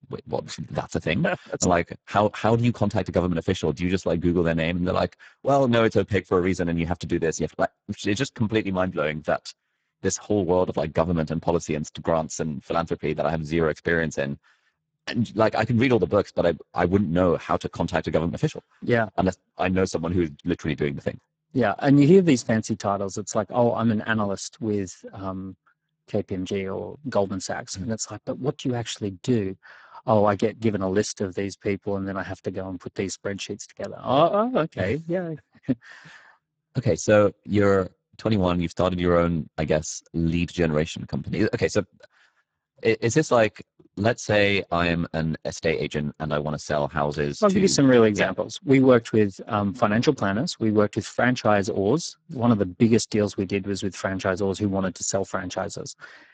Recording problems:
garbled, watery; badly; nothing above 7.5 kHz

